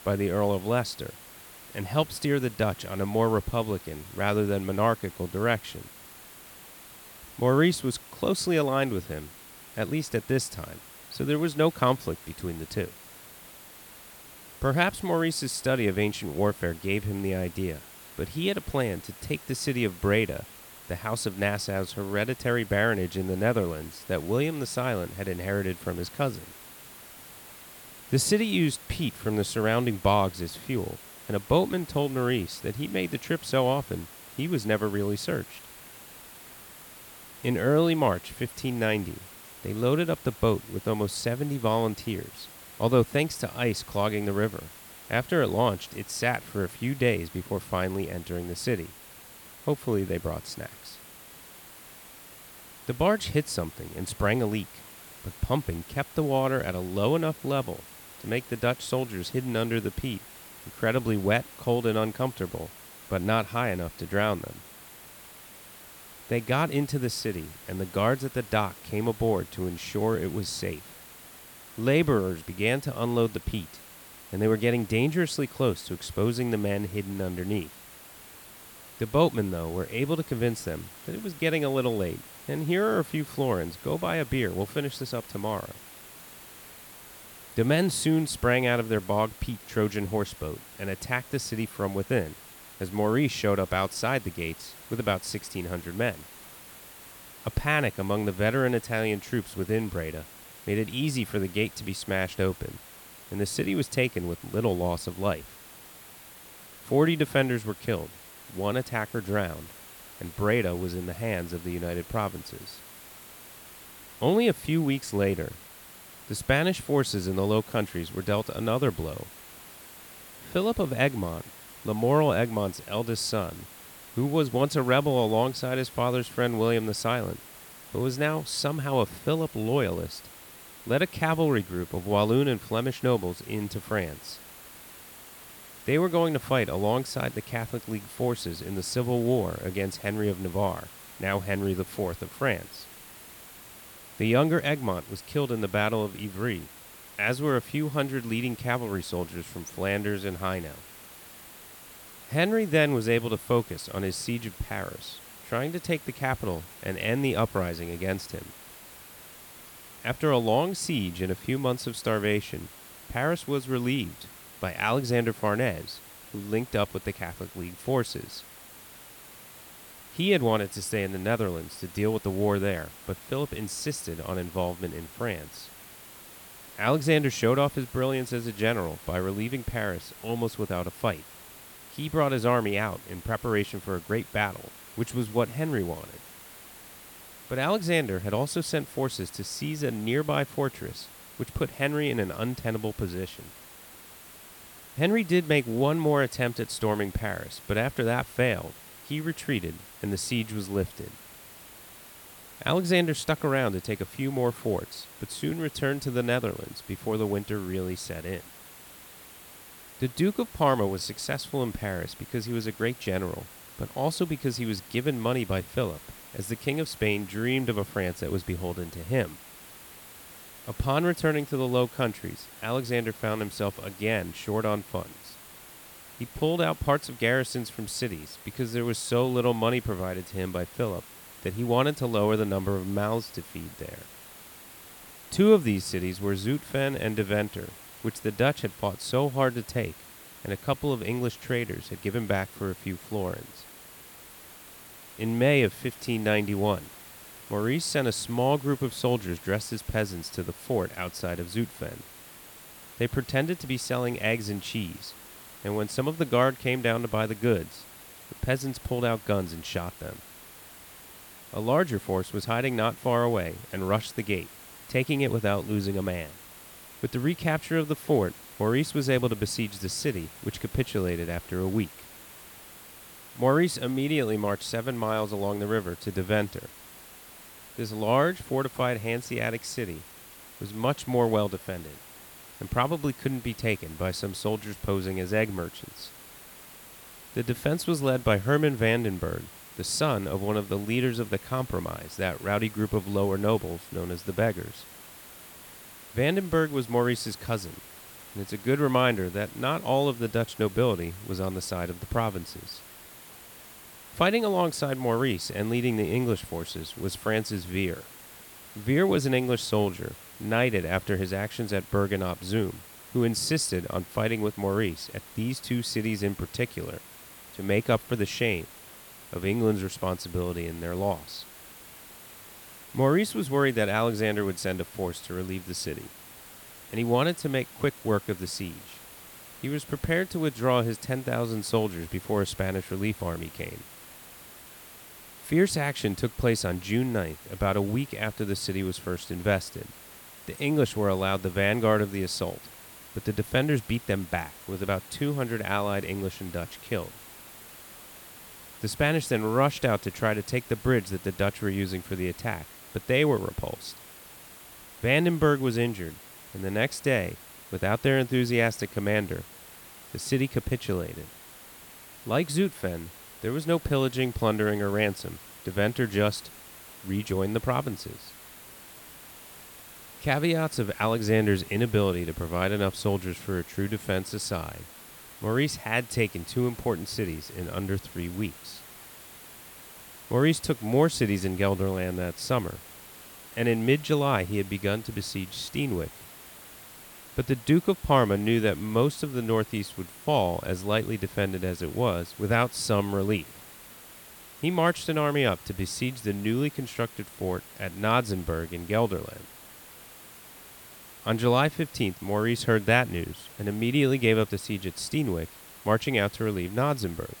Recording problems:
hiss; noticeable; throughout; 15 dB below the speech

